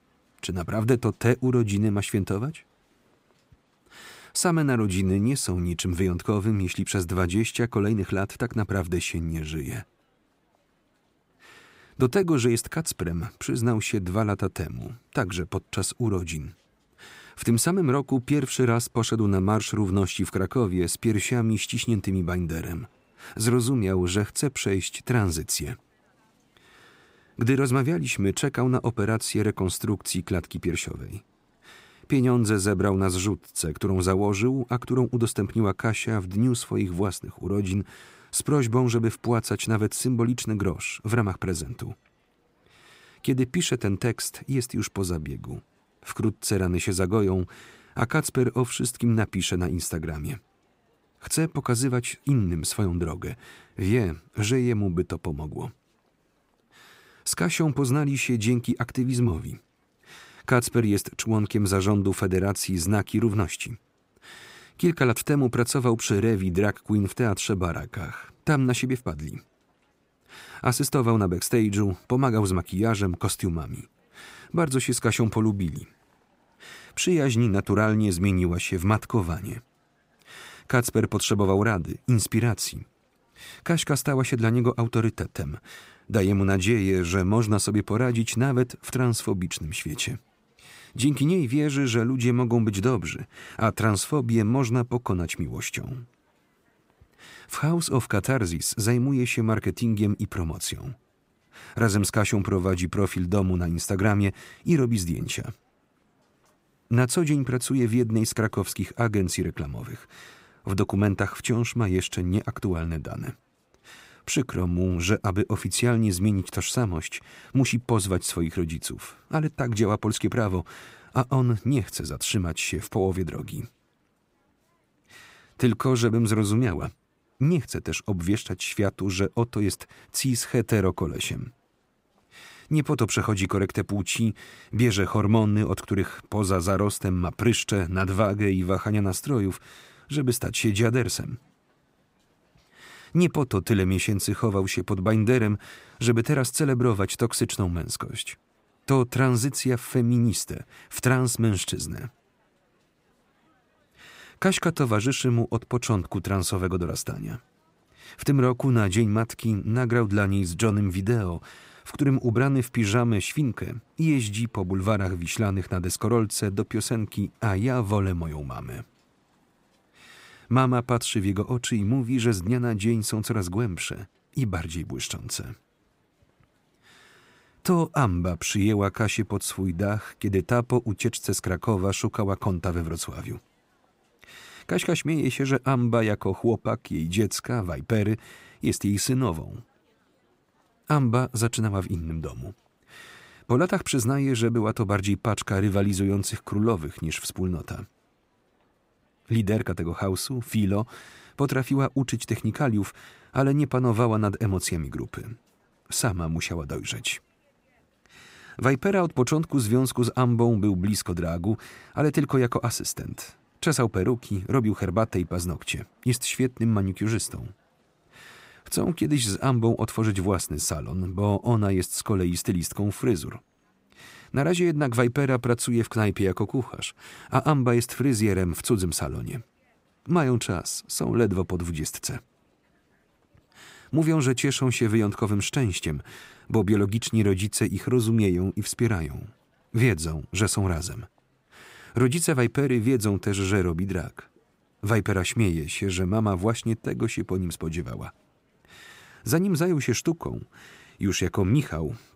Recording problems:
none

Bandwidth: 15.5 kHz